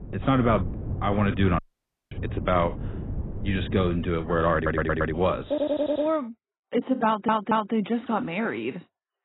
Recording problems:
garbled, watery; badly; nothing above 4 kHz
muffled; very slightly; fading above 3.5 kHz
wind noise on the microphone; occasional gusts; until 5.5 s; 20 dB below the speech
audio cutting out; at 1.5 s for 0.5 s
audio stuttering; at 4.5 s, at 5.5 s and at 7 s

